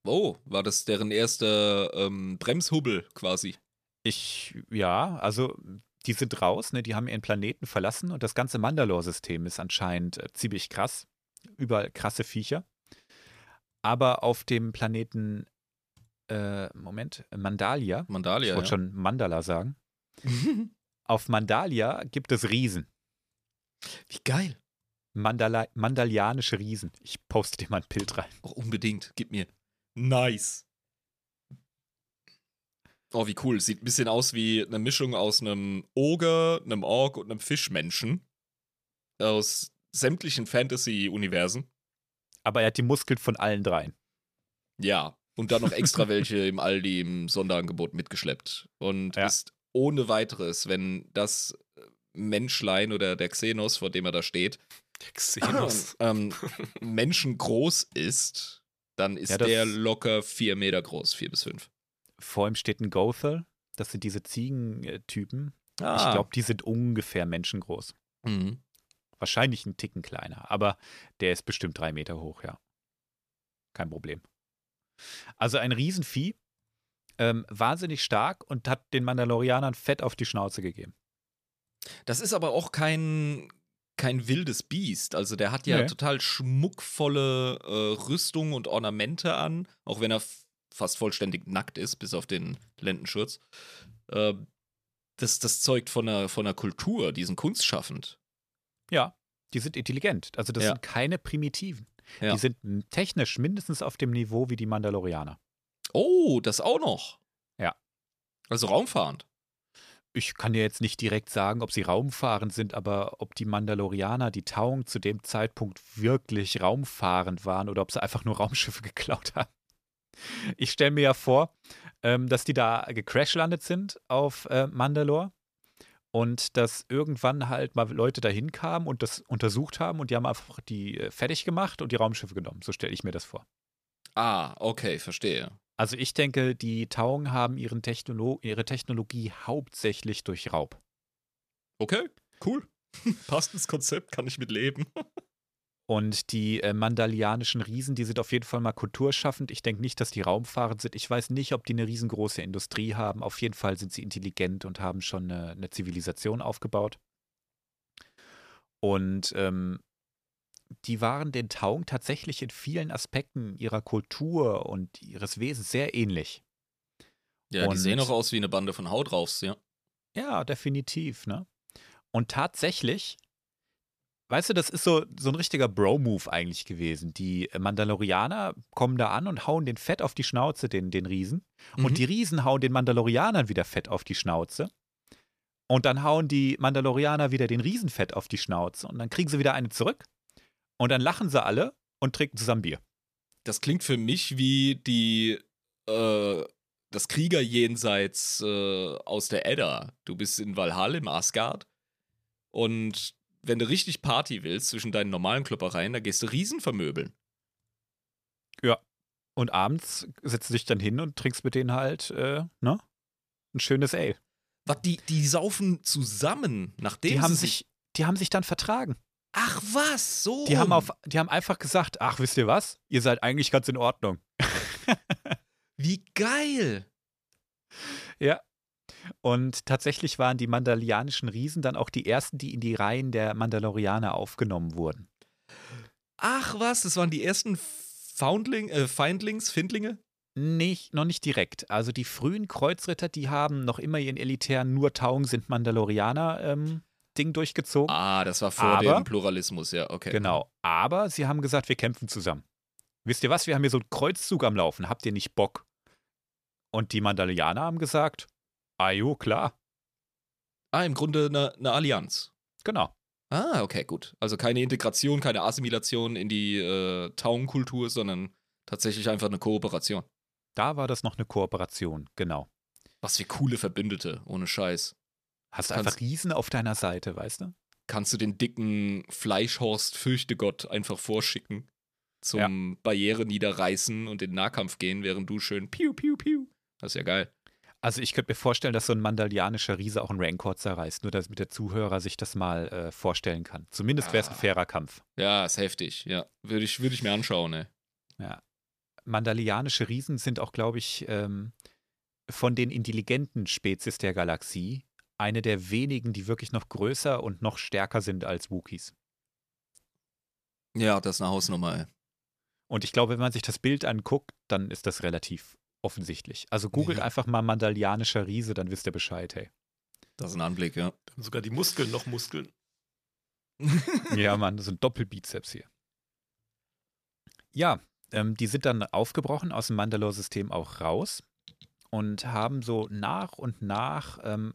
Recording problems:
none

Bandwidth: 14.5 kHz